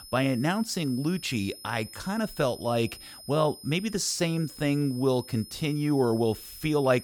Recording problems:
high-pitched whine; noticeable; throughout; 5 kHz, 15 dB below the speech

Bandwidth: 18.5 kHz